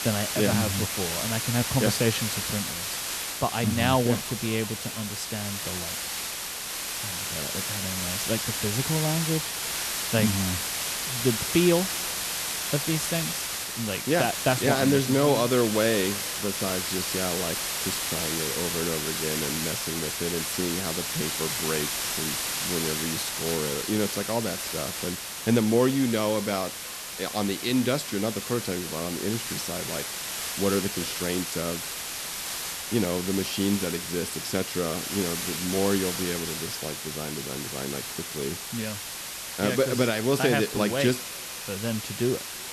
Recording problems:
echo of what is said; faint; throughout; 350 ms later, 25 dB below the speech
hiss; loud; throughout; 1 dB below the speech

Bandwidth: 13.5 kHz